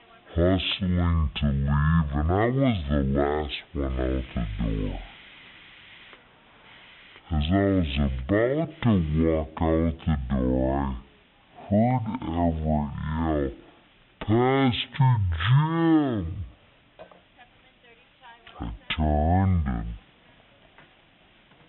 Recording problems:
high frequencies cut off; severe; nothing above 3.5 kHz
wrong speed and pitch; too slow and too low; 0.5 times normal speed
hiss; faint; throughout; 25 dB below the speech

